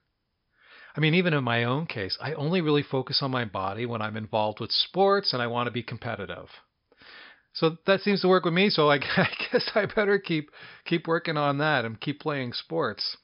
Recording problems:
high frequencies cut off; noticeable; nothing above 5.5 kHz

